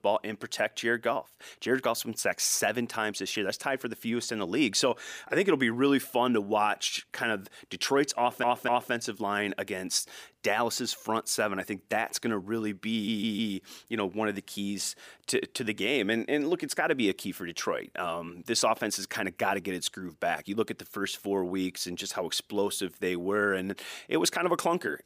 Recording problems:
audio stuttering; at 8 s and at 13 s

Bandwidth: 15 kHz